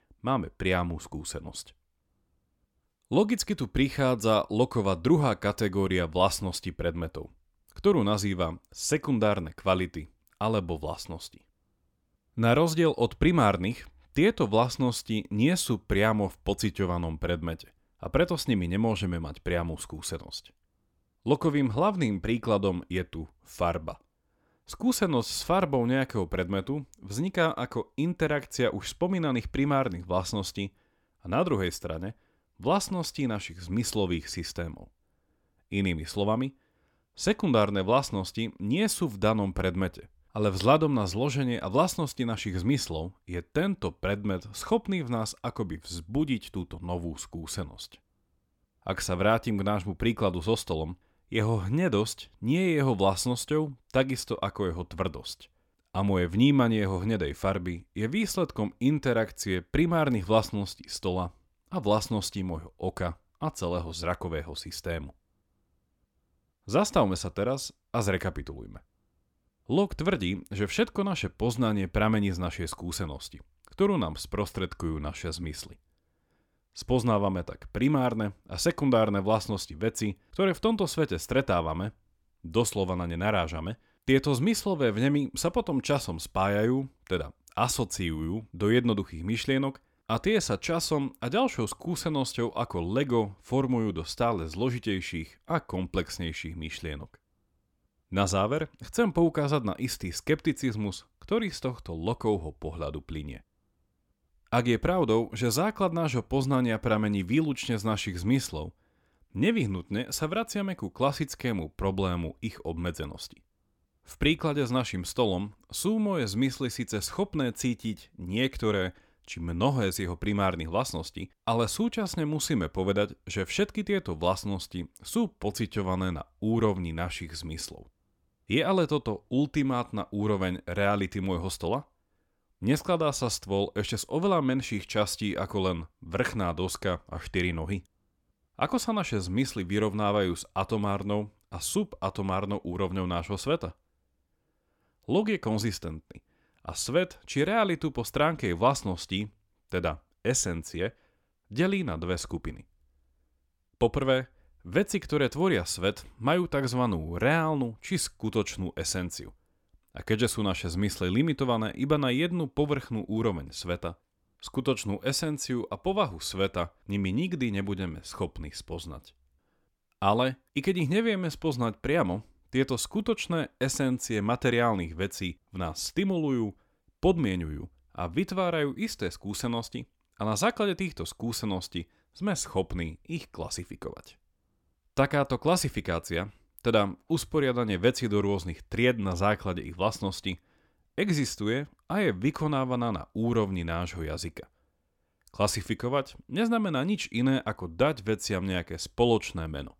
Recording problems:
none

